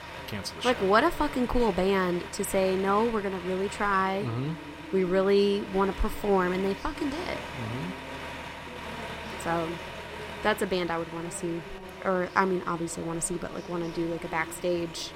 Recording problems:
traffic noise; noticeable; throughout; 10 dB below the speech
voice in the background; noticeable; throughout; 20 dB below the speech

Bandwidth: 16 kHz